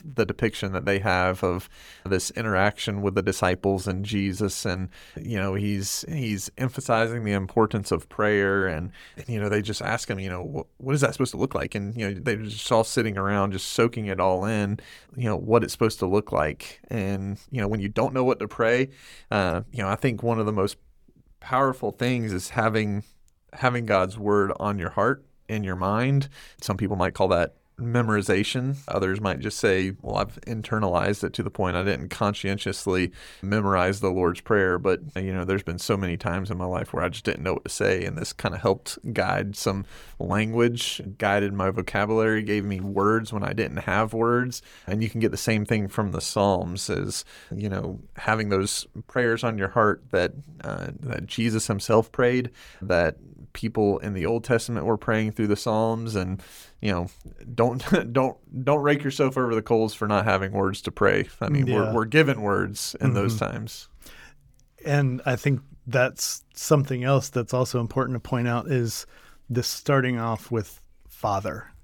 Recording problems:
uneven, jittery; strongly; from 3.5 s to 1:10

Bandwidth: 18.5 kHz